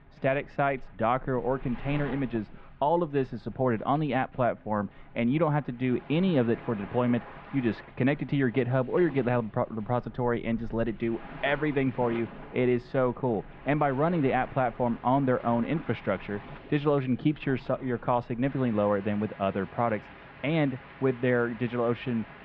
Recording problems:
muffled; very; fading above 2.5 kHz
rain or running water; noticeable; throughout; 20 dB below the speech

